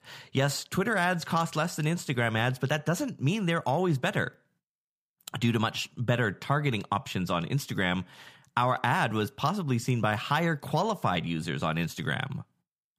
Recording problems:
none

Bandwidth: 15 kHz